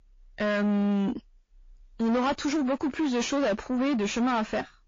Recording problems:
distortion; heavy; 6 dB below the speech
garbled, watery; slightly; nothing above 7 kHz

